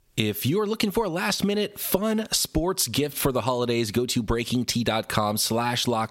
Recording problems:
squashed, flat; somewhat

